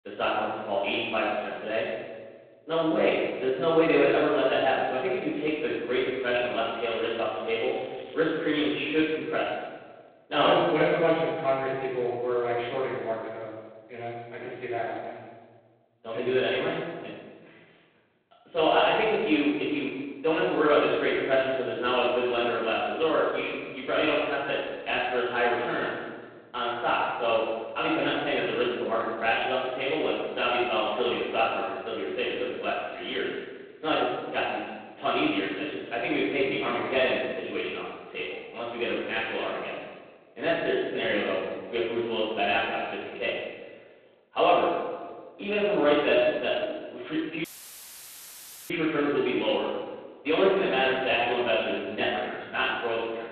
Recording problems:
phone-call audio; poor line
room echo; strong; dies away in 1.3 s
off-mic speech; far
crackling; faint; from 6 to 9 s and at 29 s; 25 dB below the speech
audio cutting out; filled with static; at 47 s for 1.5 s

